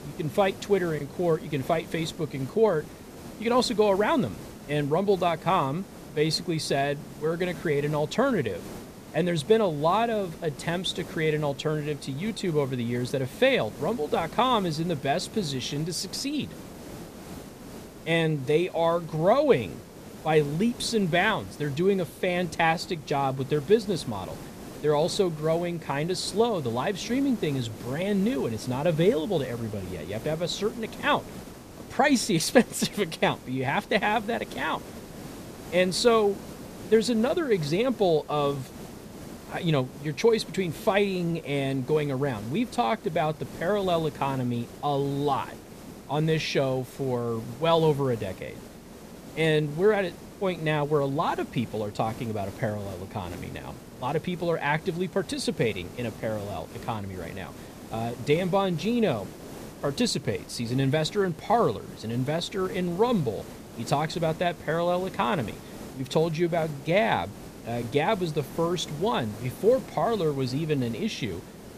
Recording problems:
hiss; noticeable; throughout; 15 dB below the speech

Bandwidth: 14.5 kHz